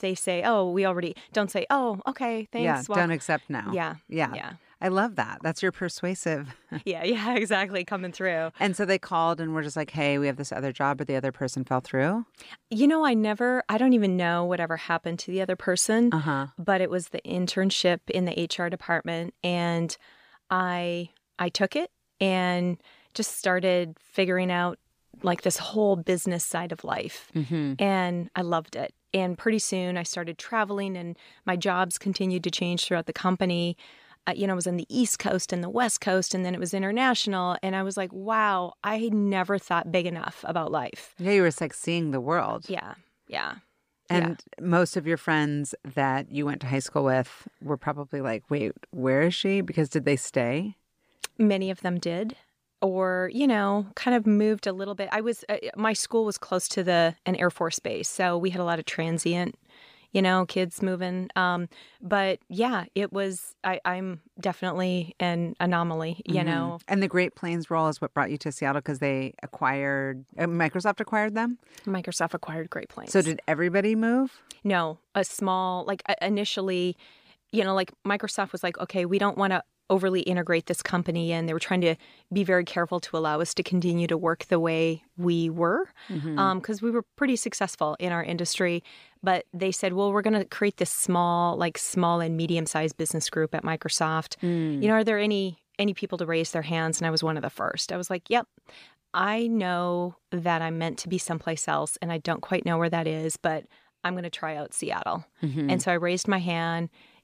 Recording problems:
none

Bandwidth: 14.5 kHz